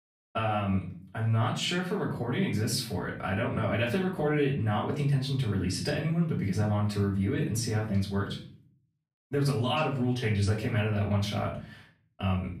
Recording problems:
off-mic speech; far
room echo; slight; dies away in 0.5 s

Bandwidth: 15 kHz